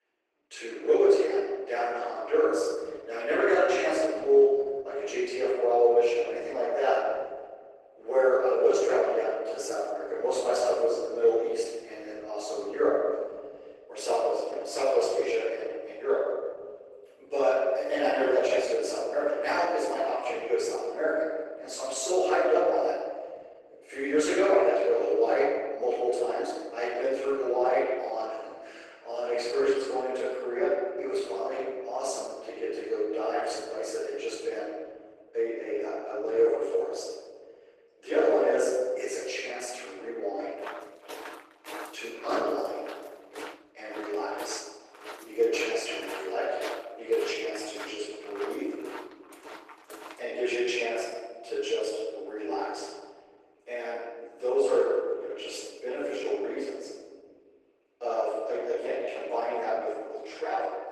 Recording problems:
room echo; strong; dies away in 1.4 s
off-mic speech; far
thin; somewhat; fading below 300 Hz
garbled, watery; slightly; nothing above 12 kHz
footsteps; faint; from 41 to 50 s; peak 10 dB below the speech

